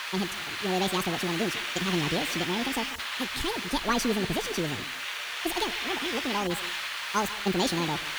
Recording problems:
wrong speed and pitch; too fast and too high; 1.7 times normal speed
echo of what is said; noticeable; throughout; 140 ms later, 15 dB below the speech
hiss; loud; throughout; 1 dB below the speech

